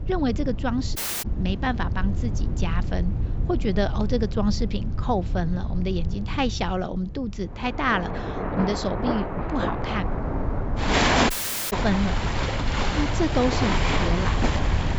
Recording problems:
high frequencies cut off; noticeable; nothing above 8 kHz
rain or running water; very loud; from 8 s on; 1 dB above the speech
wind noise on the microphone; occasional gusts; 15 dB below the speech
audio cutting out; at 1 s and at 11 s

